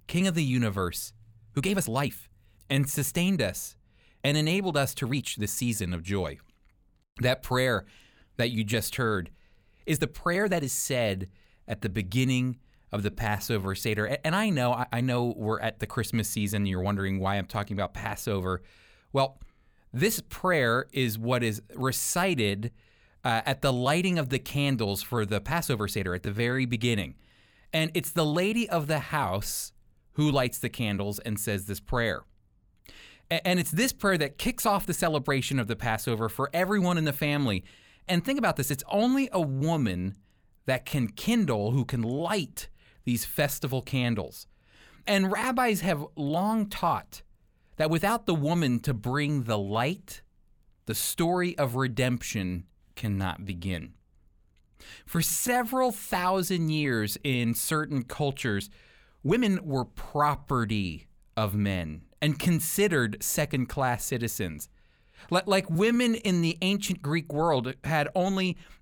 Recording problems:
uneven, jittery; strongly; from 1.5 s to 1:06

